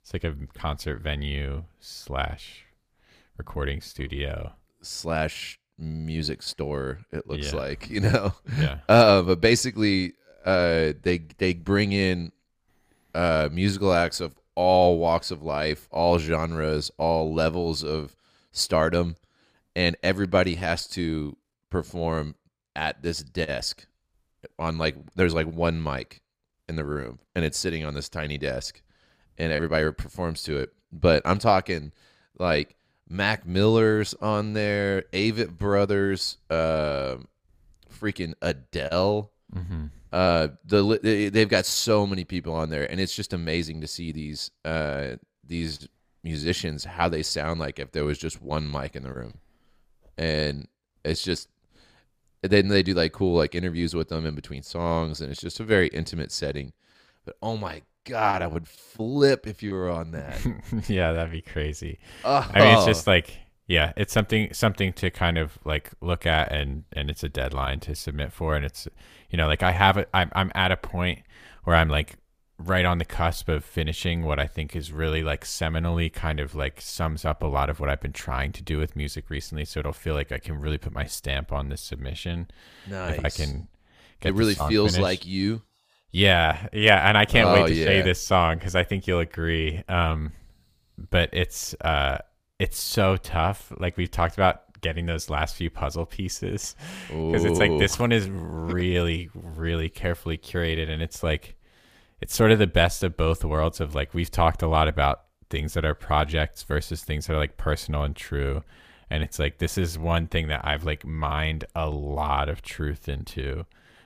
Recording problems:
none

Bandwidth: 15 kHz